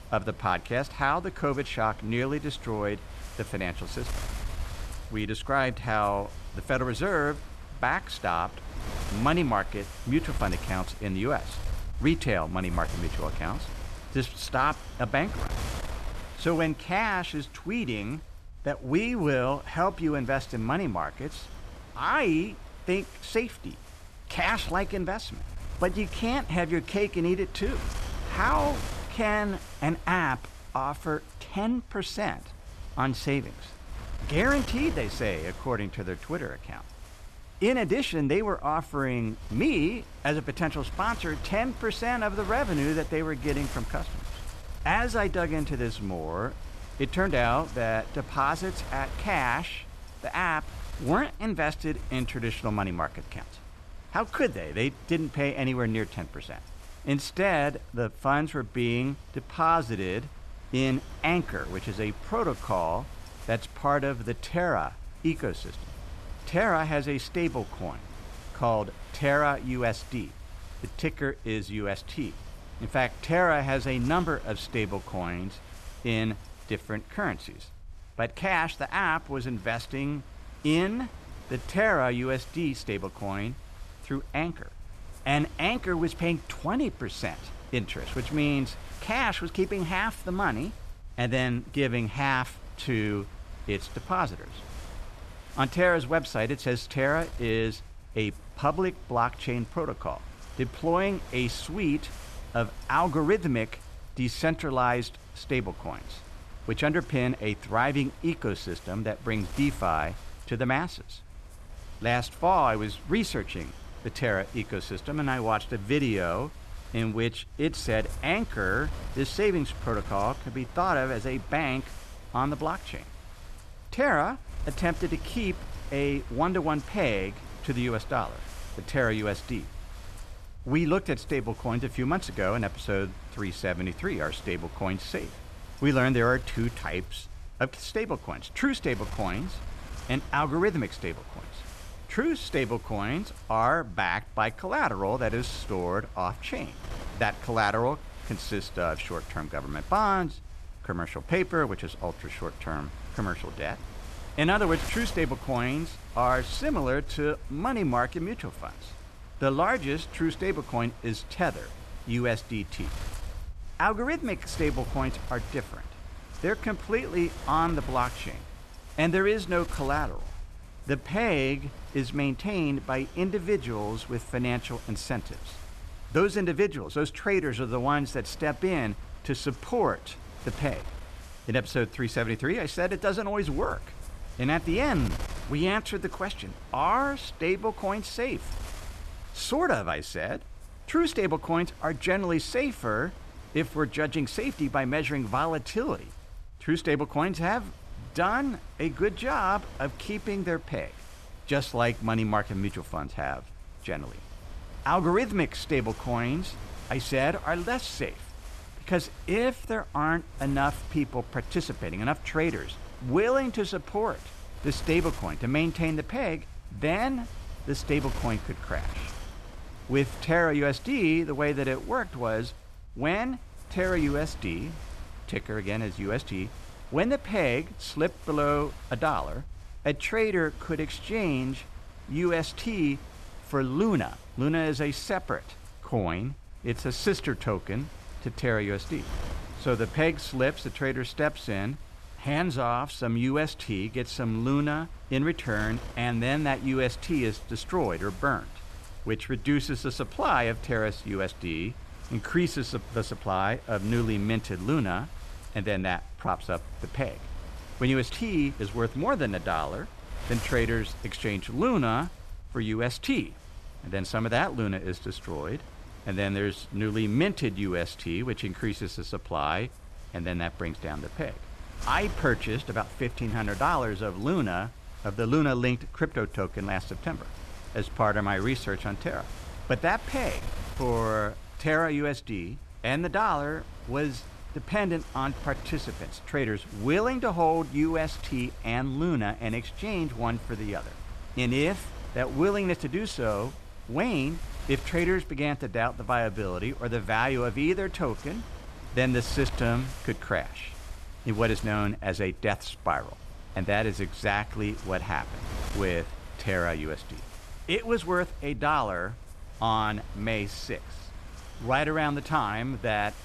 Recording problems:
wind noise on the microphone; occasional gusts; 20 dB below the speech

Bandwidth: 13.5 kHz